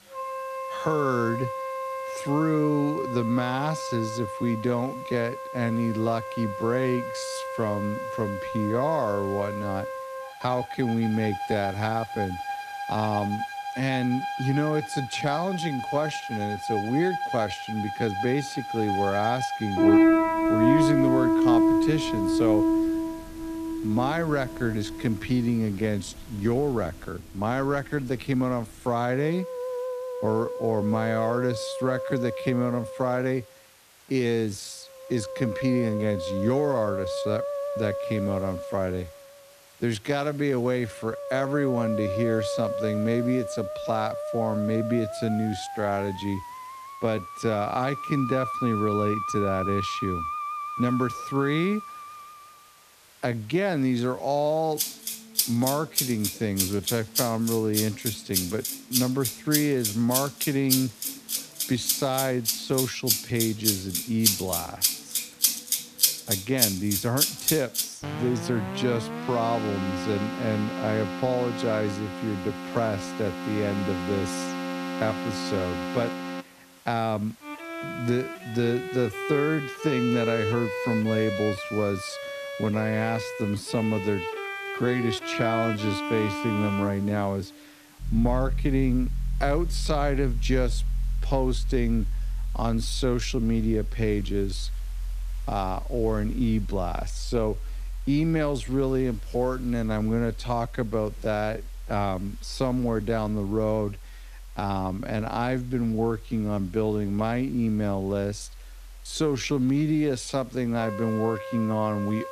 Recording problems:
wrong speed, natural pitch; too slow; 0.7 times normal speed
background music; loud; throughout; 2 dB below the speech
hiss; faint; throughout; 25 dB below the speech

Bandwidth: 14.5 kHz